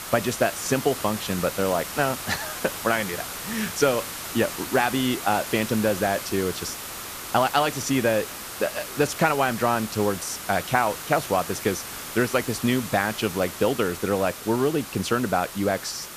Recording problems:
hiss; loud; throughout; 8 dB below the speech

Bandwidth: 14.5 kHz